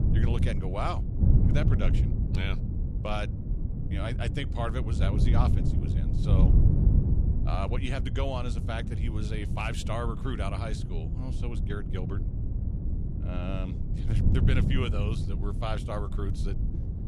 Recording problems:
wind noise on the microphone; heavy; 5 dB below the speech

